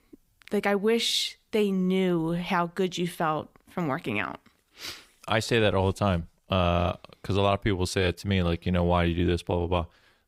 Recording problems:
none

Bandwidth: 15.5 kHz